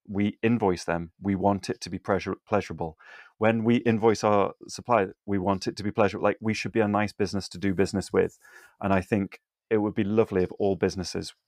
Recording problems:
none

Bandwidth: 15.5 kHz